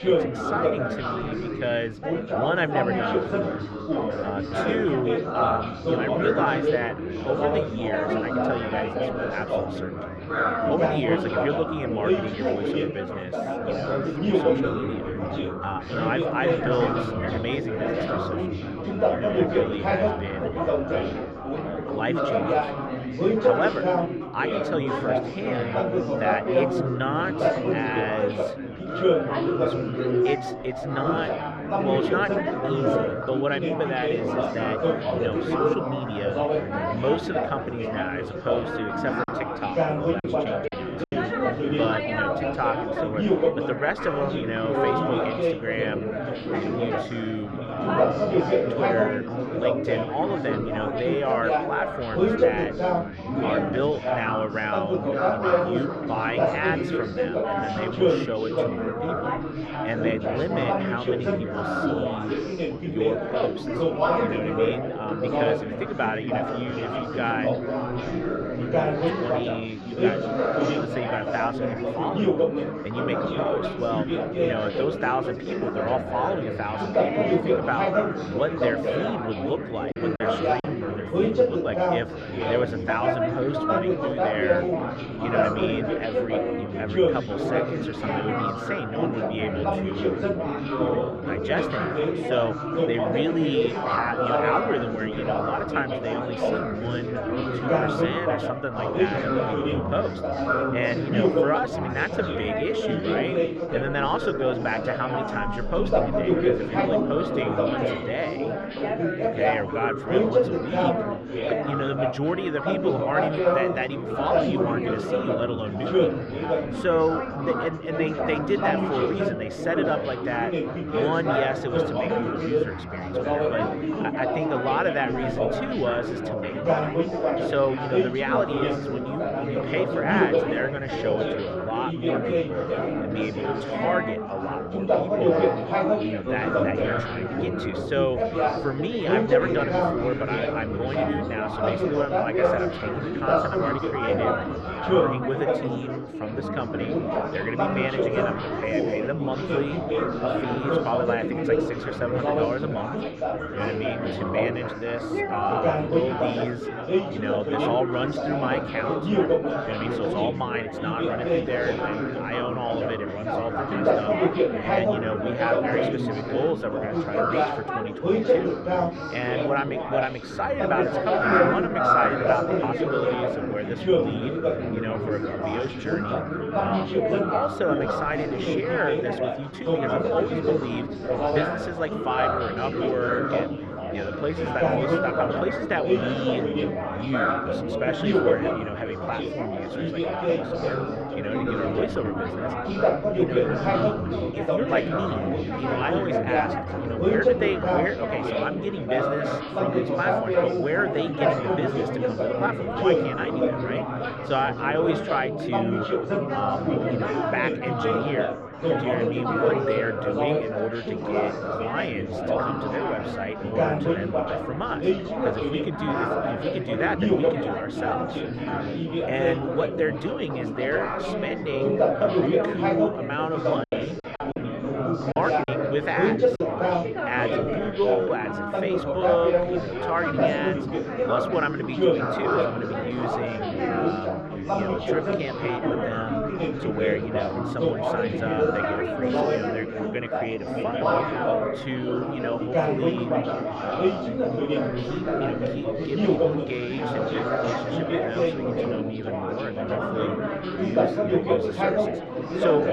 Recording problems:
muffled; slightly; fading above 3 kHz
chatter from many people; very loud; throughout; 4 dB above the speech
choppy; very; from 39 to 41 s, at 1:20 and from 3:44 to 3:46; 9% of the speech affected

